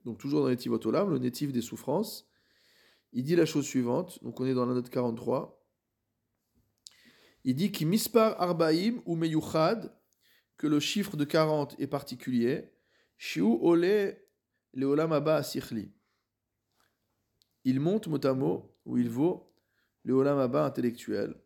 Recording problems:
none

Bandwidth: 17 kHz